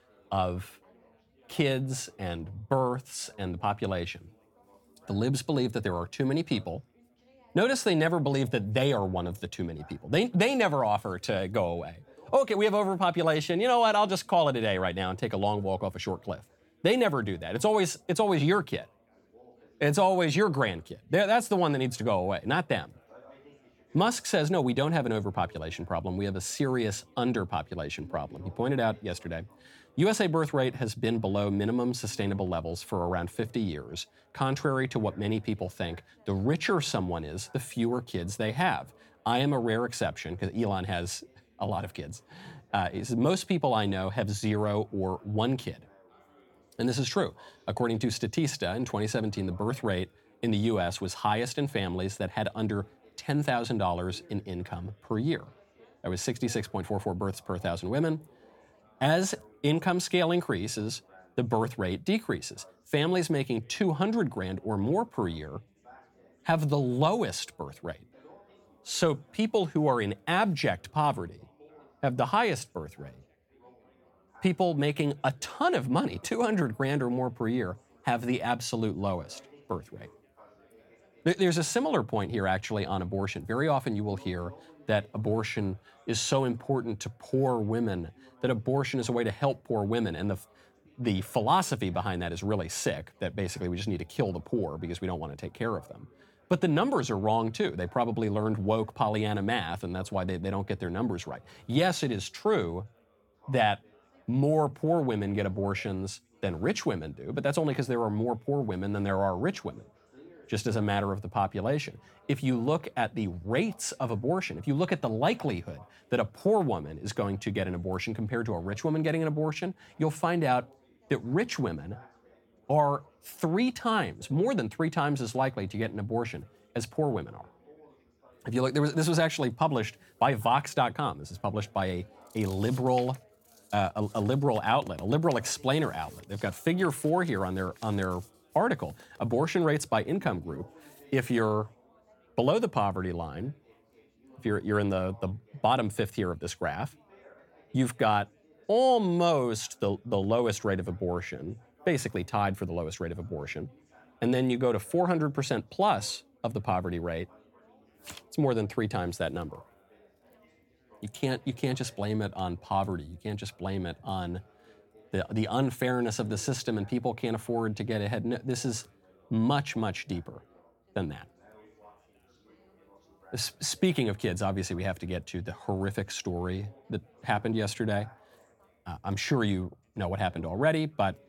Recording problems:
background chatter; faint; throughout; 4 voices, 30 dB below the speech

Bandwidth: 17.5 kHz